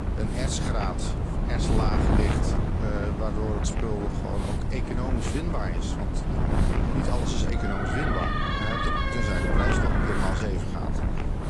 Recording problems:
garbled, watery; slightly
wind noise on the microphone; heavy; as loud as the speech
hiss; noticeable; throughout; 15 dB below the speech
traffic noise; faint; throughout; 20 dB below the speech
door banging; loud; from 7.5 to 10 s; peak 5 dB above the speech

